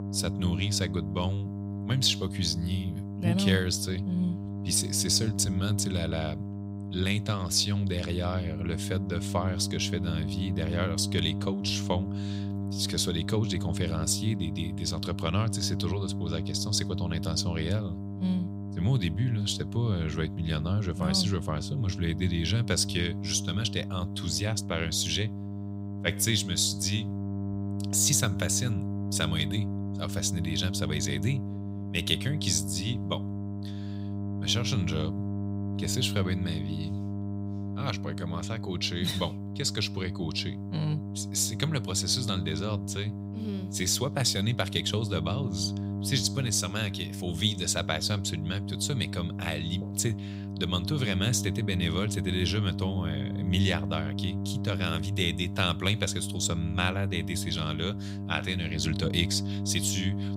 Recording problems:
electrical hum; noticeable; throughout; 50 Hz, 10 dB below the speech

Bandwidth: 15.5 kHz